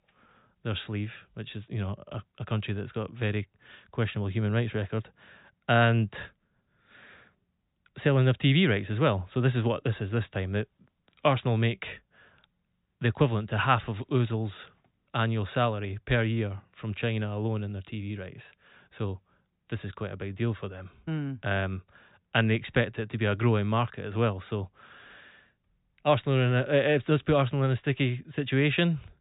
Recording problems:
high frequencies cut off; severe; nothing above 4 kHz

